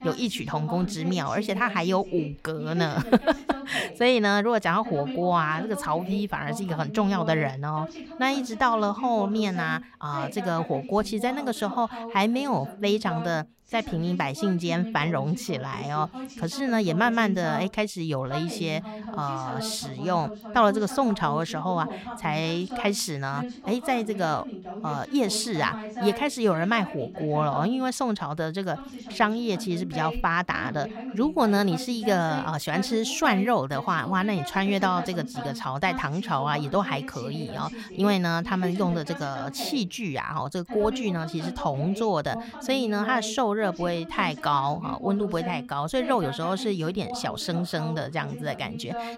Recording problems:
voice in the background; noticeable; throughout; 10 dB below the speech

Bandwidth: 16 kHz